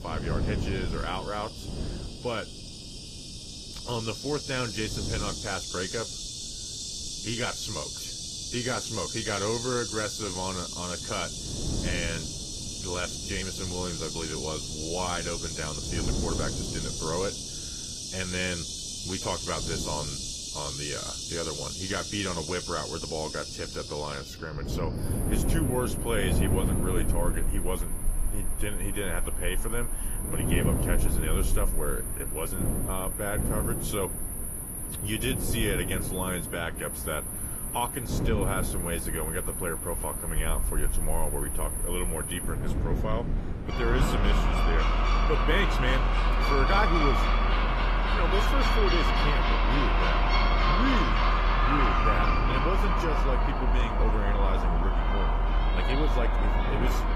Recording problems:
garbled, watery; slightly; nothing above 14.5 kHz
animal sounds; very loud; throughout; 3 dB above the speech
wind noise on the microphone; occasional gusts; 10 dB below the speech

